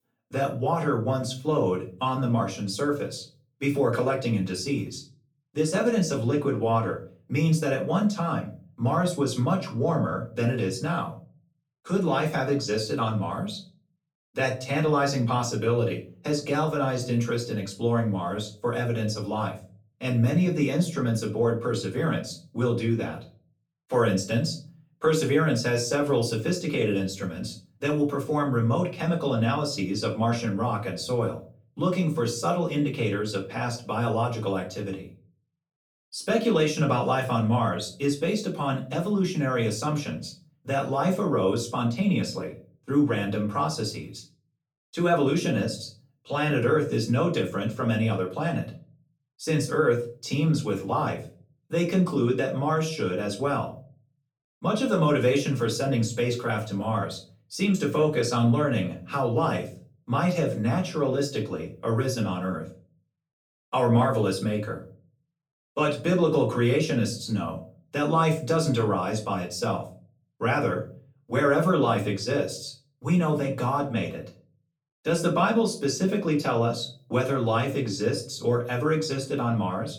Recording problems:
off-mic speech; far
room echo; slight; dies away in 0.3 s

